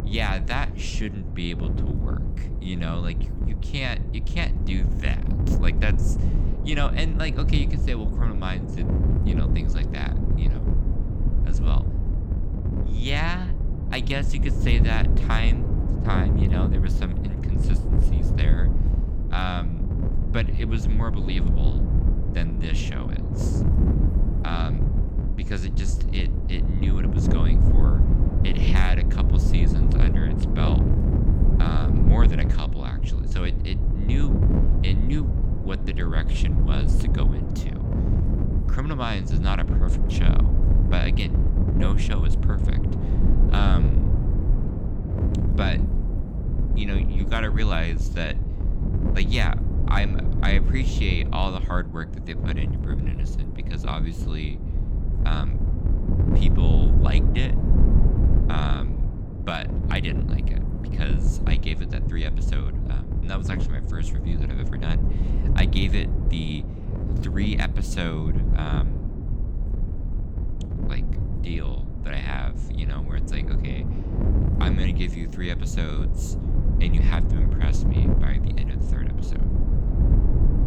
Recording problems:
wind noise on the microphone; heavy; 4 dB below the speech

